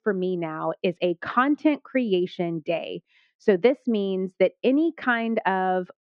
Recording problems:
muffled; very; fading above 2.5 kHz

